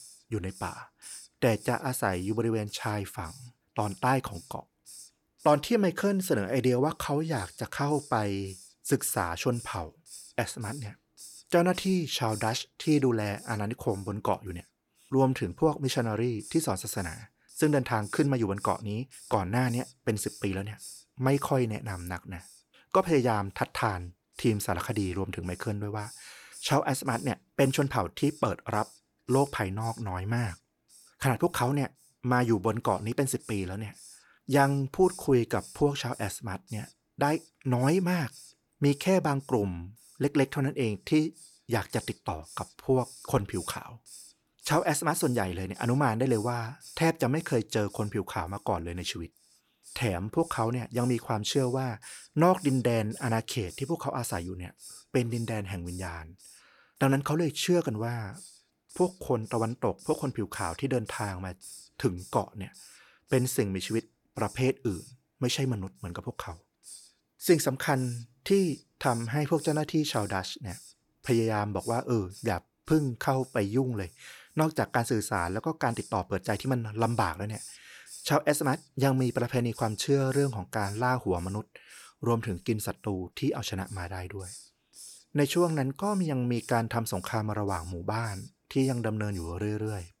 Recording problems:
hiss; noticeable; throughout; 20 dB below the speech

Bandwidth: 18.5 kHz